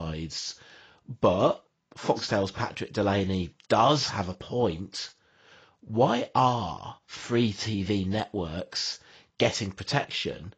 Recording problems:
garbled, watery; badly; nothing above 7.5 kHz
abrupt cut into speech; at the start

